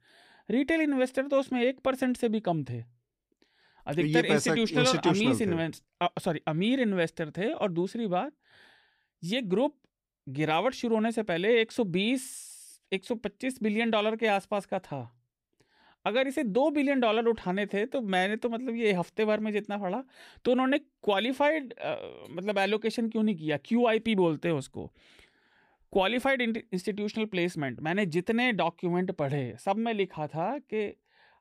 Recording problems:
none

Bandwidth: 15.5 kHz